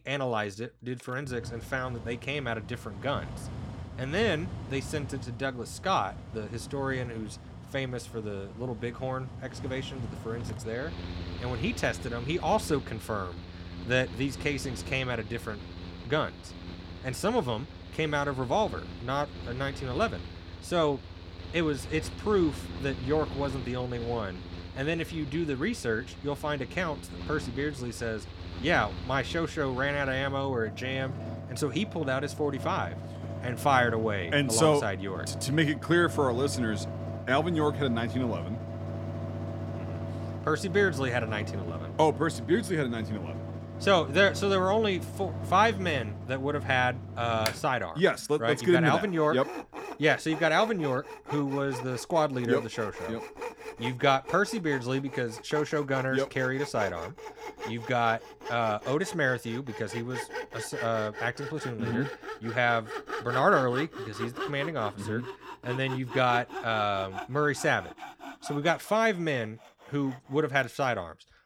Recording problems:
machinery noise; noticeable; throughout; 10 dB below the speech

